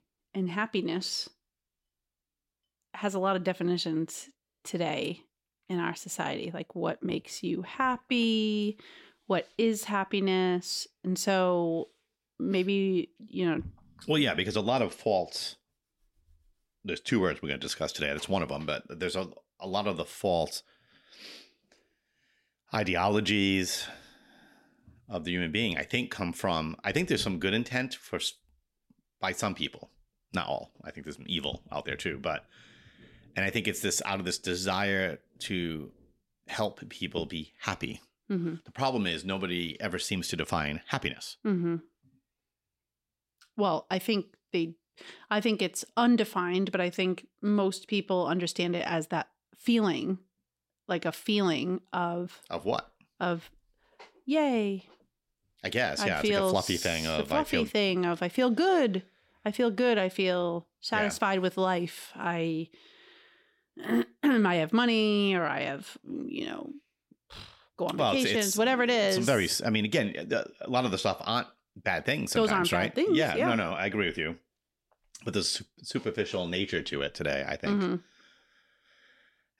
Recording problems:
none

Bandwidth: 16.5 kHz